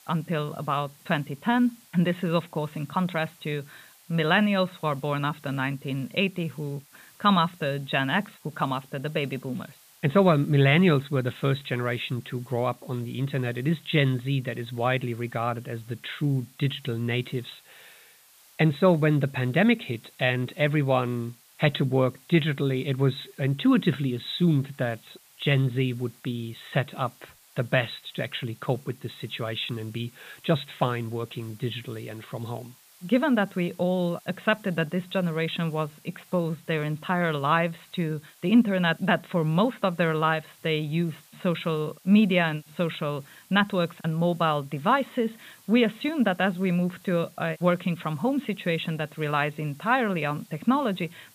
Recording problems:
high frequencies cut off; severe; nothing above 4 kHz
hiss; faint; throughout; 25 dB below the speech

